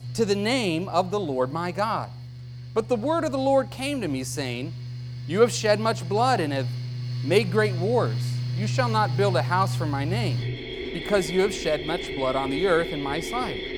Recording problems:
machinery noise; loud; throughout; 6 dB below the speech

